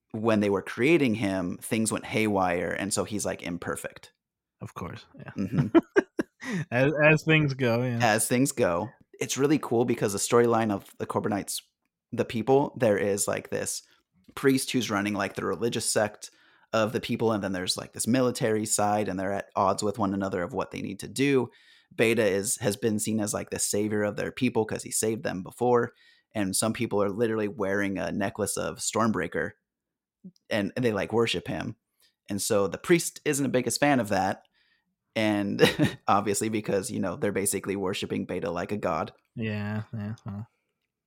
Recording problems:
none

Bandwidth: 16.5 kHz